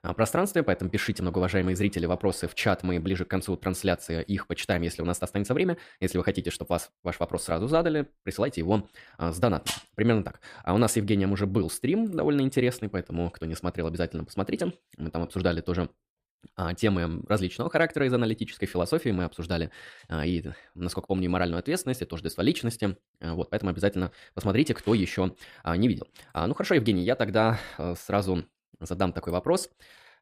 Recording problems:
none

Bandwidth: 15 kHz